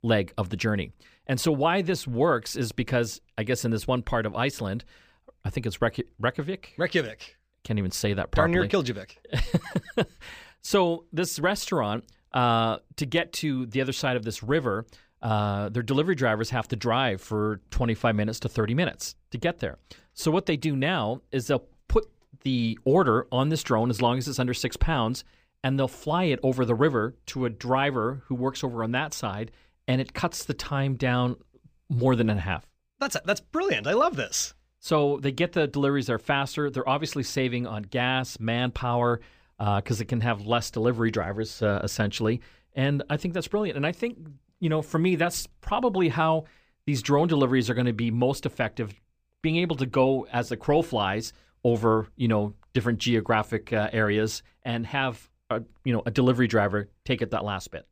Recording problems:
none

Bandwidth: 15 kHz